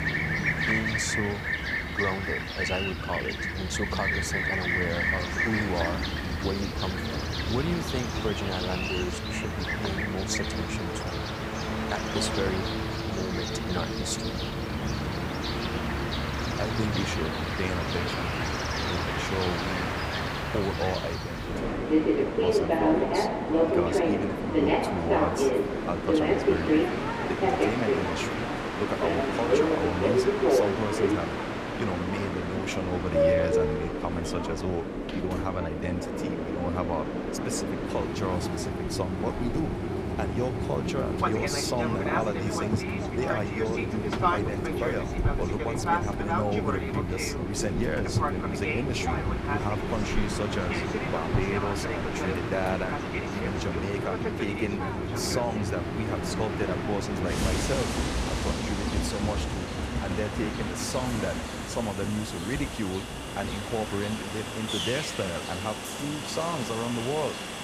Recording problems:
train or aircraft noise; very loud; throughout; 4 dB above the speech

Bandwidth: 15.5 kHz